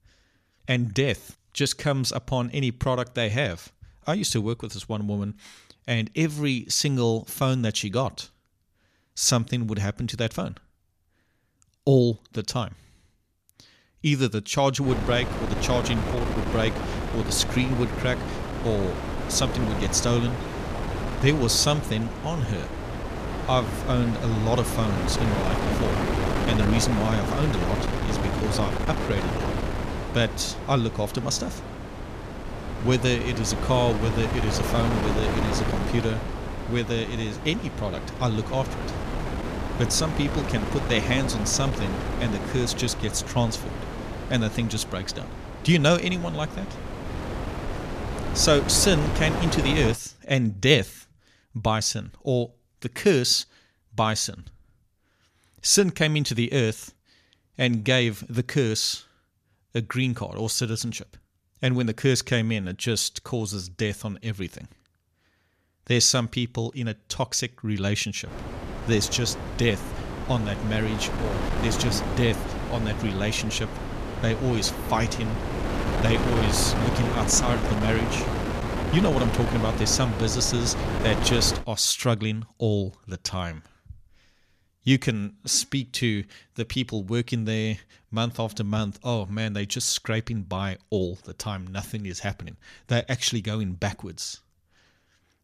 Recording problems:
wind noise on the microphone; heavy; from 15 to 50 s and from 1:08 to 1:22; 5 dB below the speech

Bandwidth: 14.5 kHz